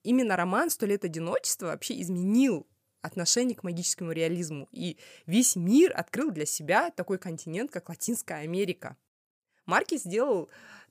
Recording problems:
none

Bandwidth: 15 kHz